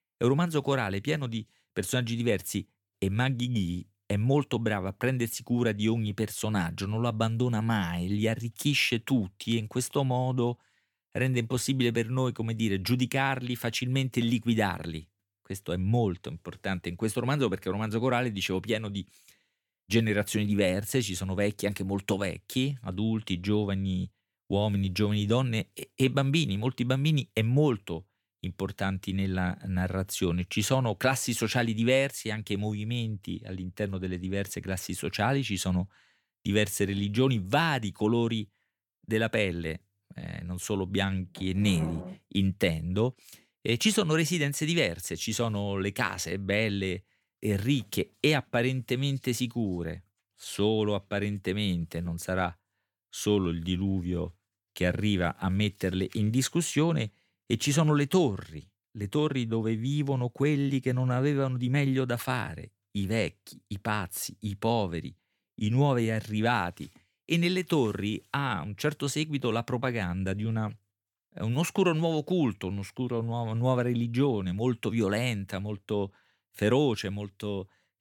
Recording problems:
none

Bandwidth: 18 kHz